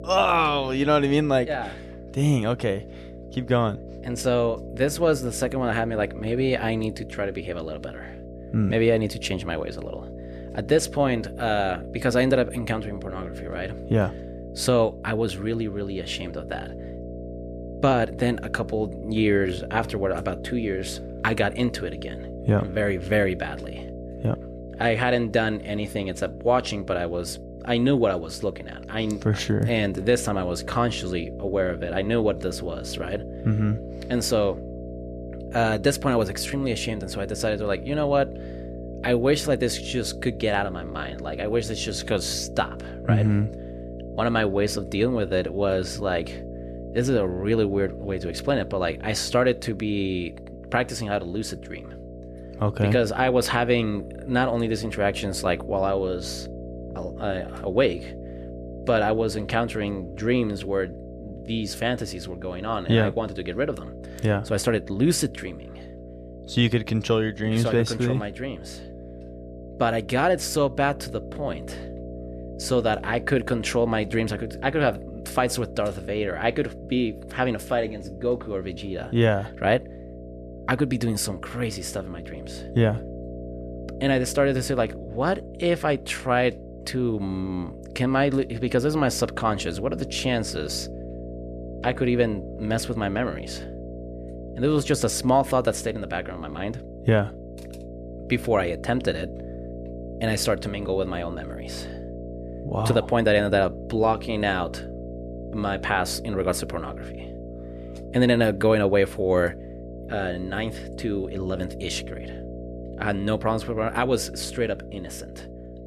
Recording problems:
electrical hum; noticeable; throughout; 60 Hz, 15 dB below the speech

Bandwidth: 14 kHz